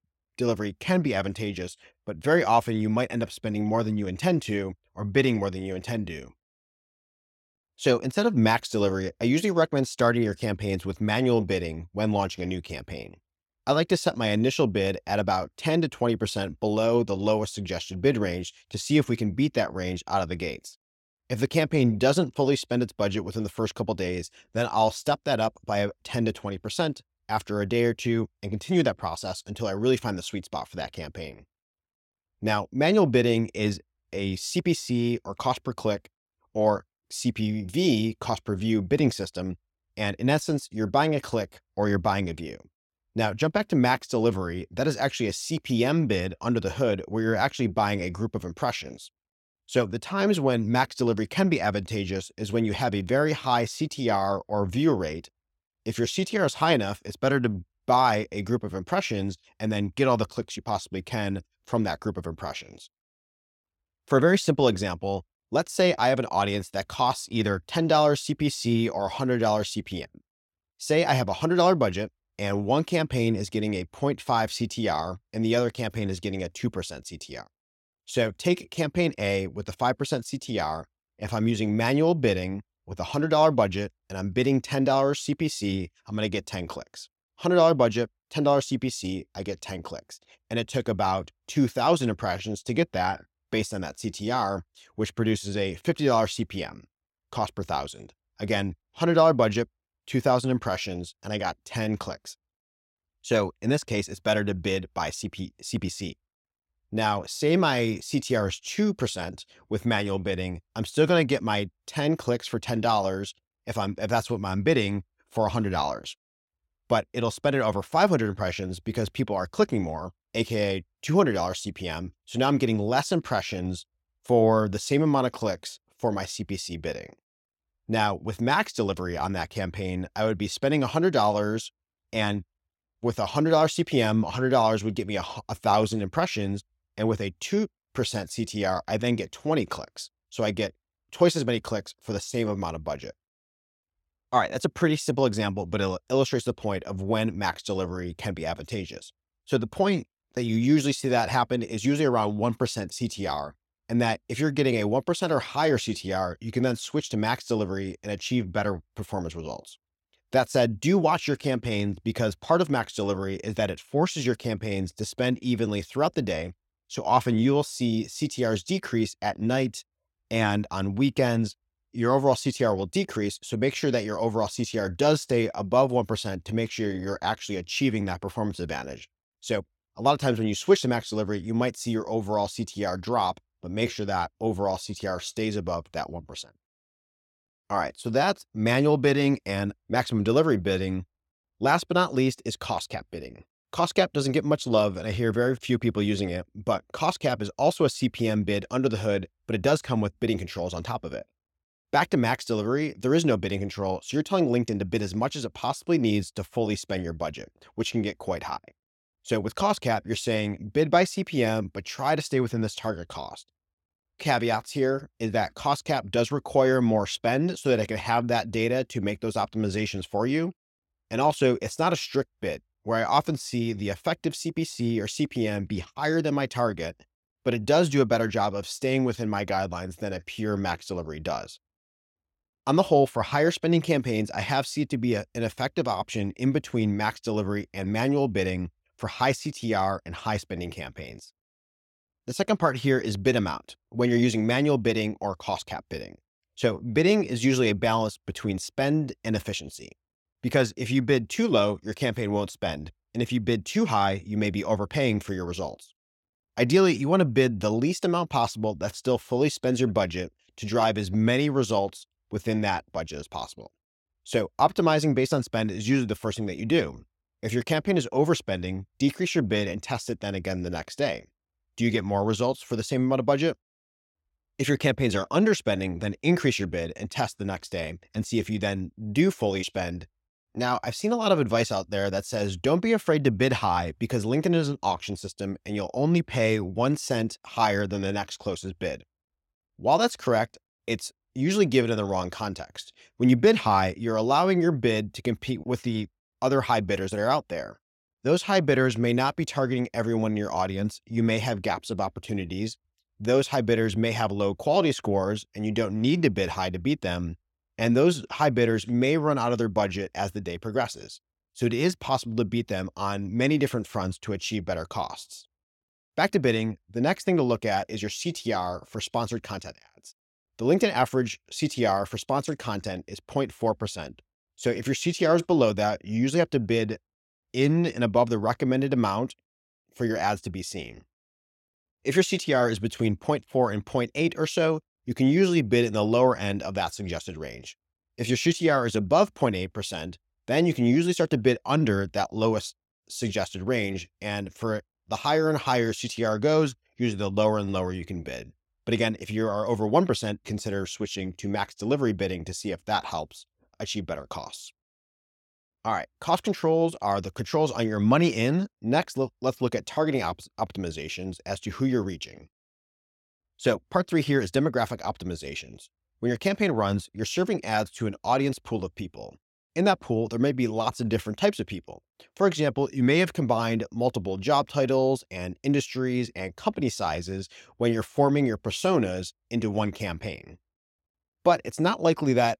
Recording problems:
none

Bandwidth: 16.5 kHz